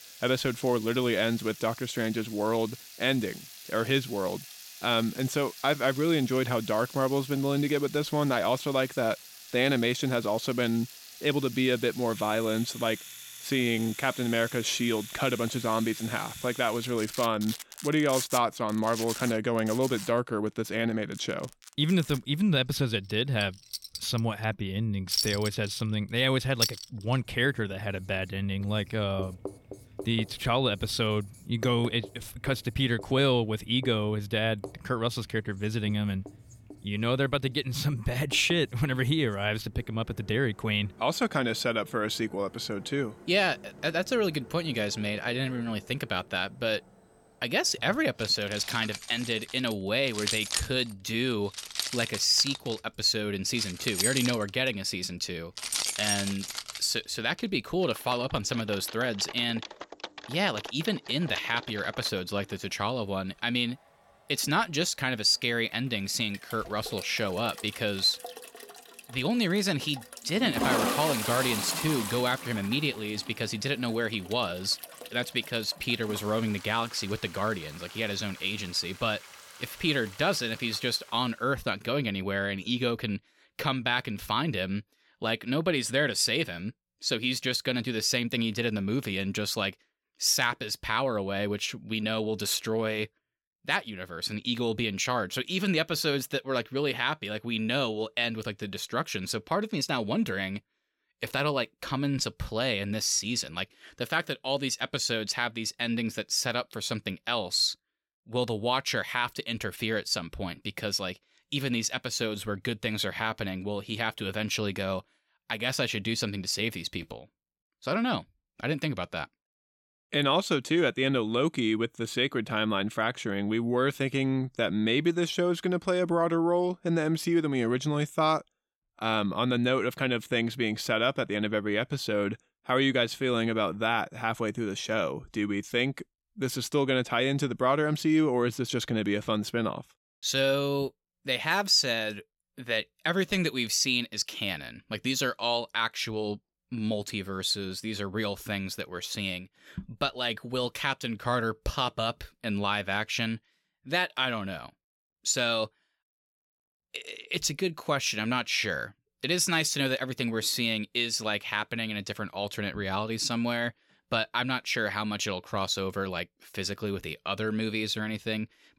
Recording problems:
household noises; loud; until 1:21; 9 dB below the speech

